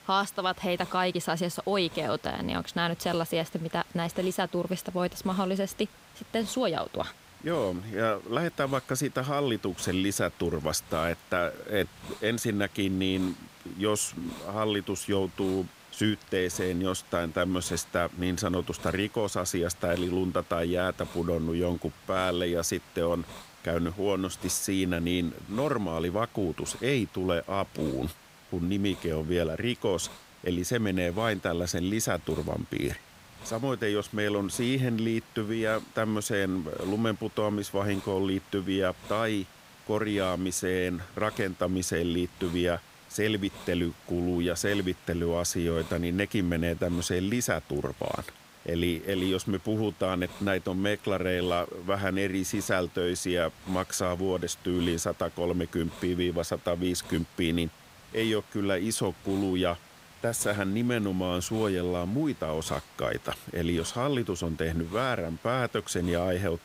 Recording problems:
hiss; noticeable; throughout; 20 dB below the speech

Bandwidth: 15.5 kHz